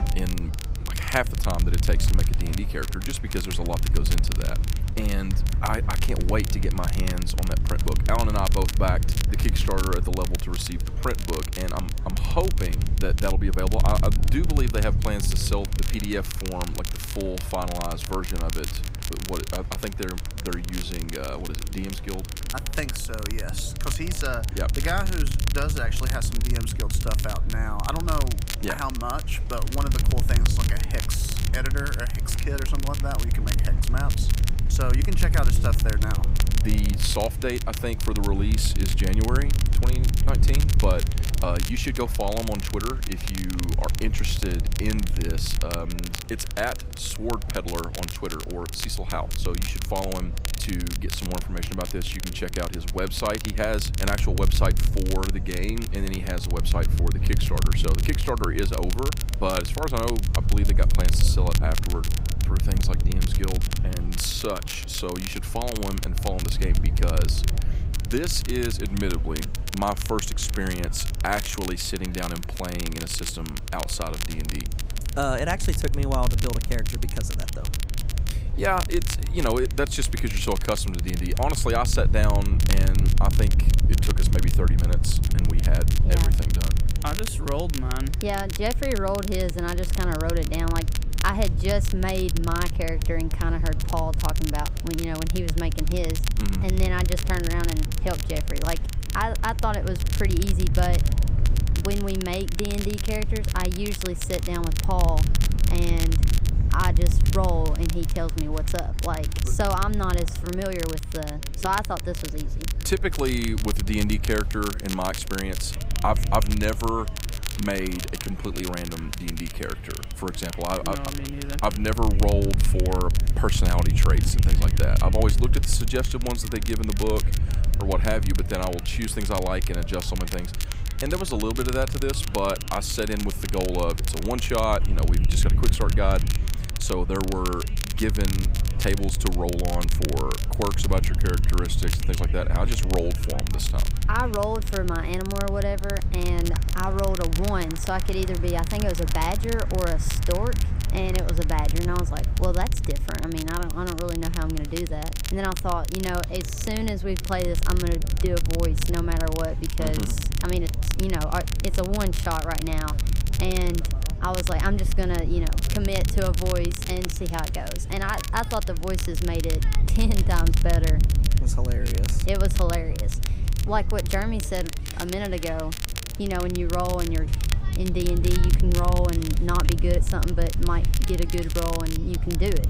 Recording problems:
crackle, like an old record; loud; 7 dB below the speech
murmuring crowd; noticeable; throughout; 20 dB below the speech
wind noise on the microphone; occasional gusts; 15 dB below the speech

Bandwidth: 15.5 kHz